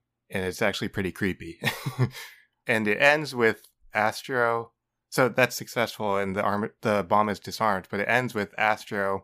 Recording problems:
none

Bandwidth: 15 kHz